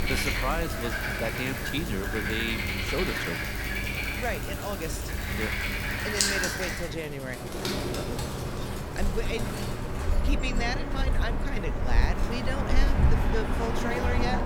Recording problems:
animal sounds; very loud; throughout; 5 dB above the speech
household noises; noticeable; throughout; 15 dB below the speech
background chatter; very faint; throughout; 3 voices, 30 dB below the speech

